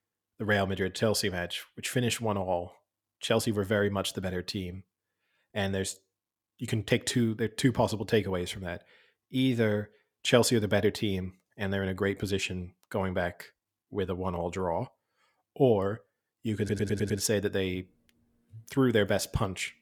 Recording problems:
audio stuttering; at 17 s

